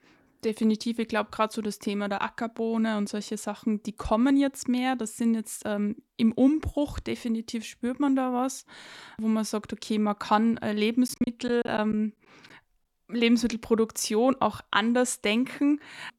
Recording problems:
choppy; very; at 11 s; 14% of the speech affected

